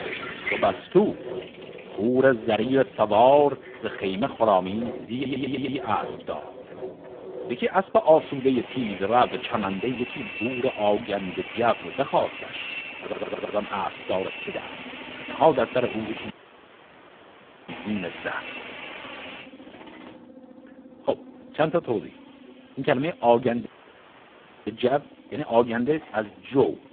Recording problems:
phone-call audio; poor line
household noises; noticeable; throughout; 10 dB below the speech
machinery noise; noticeable; throughout; 20 dB below the speech
audio stuttering; at 5 s and at 13 s
audio cutting out; at 16 s for 1.5 s and at 24 s for 1 s

